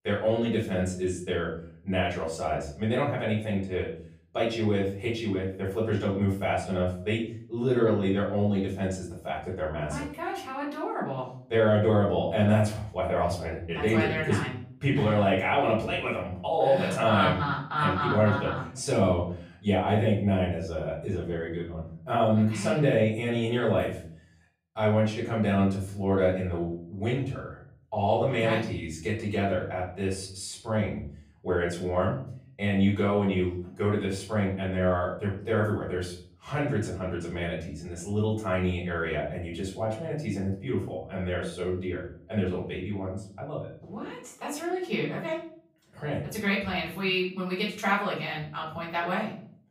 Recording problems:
off-mic speech; far
room echo; slight; dies away in 0.5 s

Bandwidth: 15 kHz